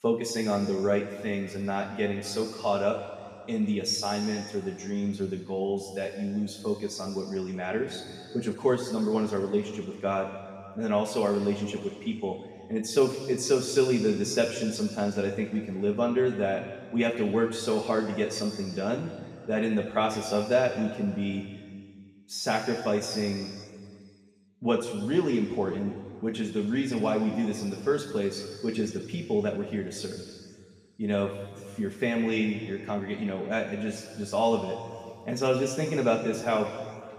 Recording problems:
off-mic speech; far
room echo; noticeable; dies away in 1.9 s

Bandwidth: 15 kHz